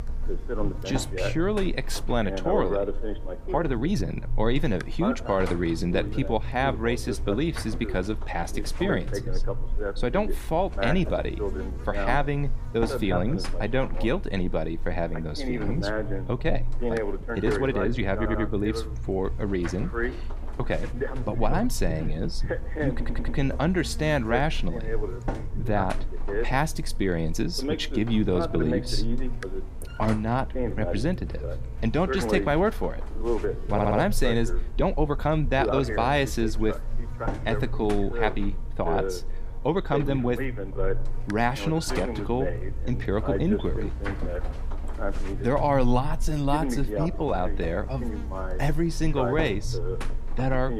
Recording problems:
voice in the background; loud; throughout; 6 dB below the speech
electrical hum; noticeable; throughout; 50 Hz, 15 dB below the speech
uneven, jittery; strongly; from 3.5 to 47 s
audio stuttering; at 18 s, at 23 s and at 34 s

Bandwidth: 15 kHz